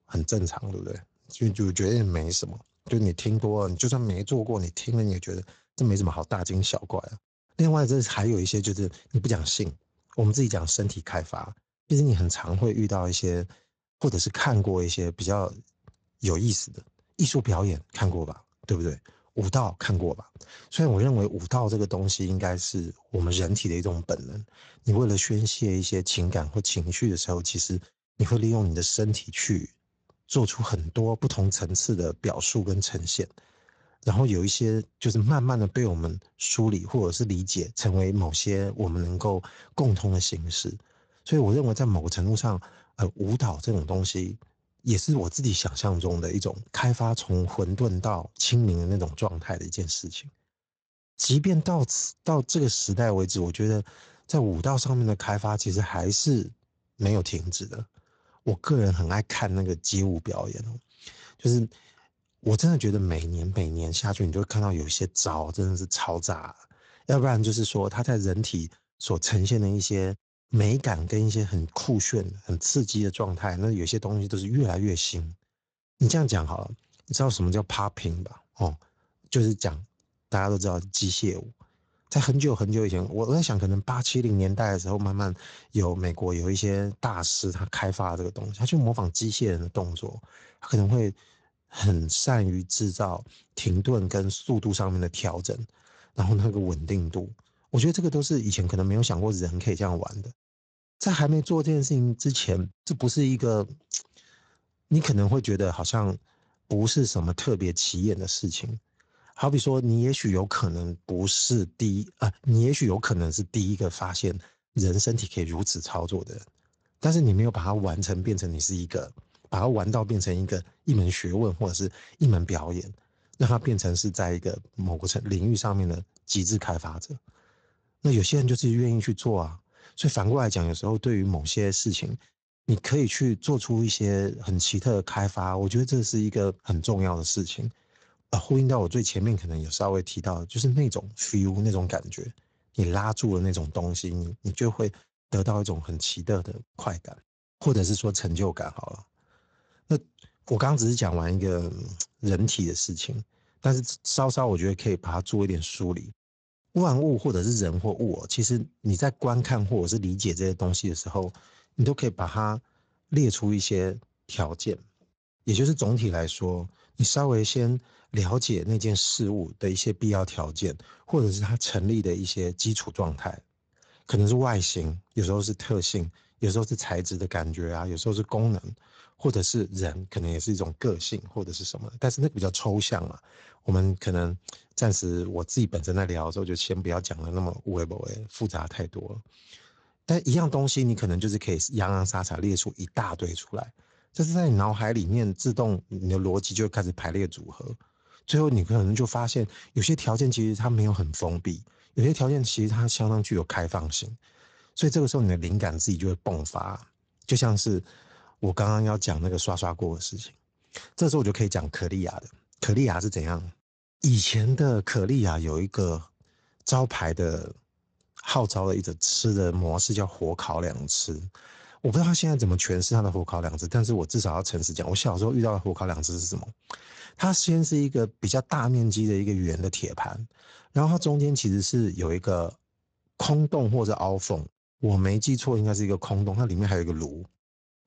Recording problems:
garbled, watery; slightly; nothing above 7.5 kHz

